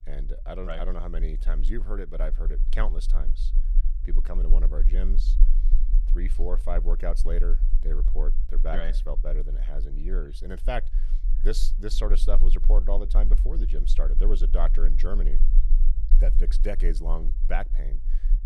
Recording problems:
low rumble; noticeable; throughout; 15 dB below the speech

